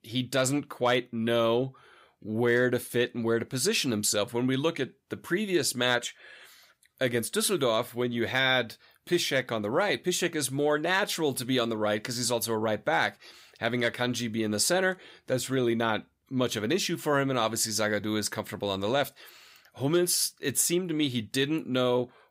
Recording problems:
none

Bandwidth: 15.5 kHz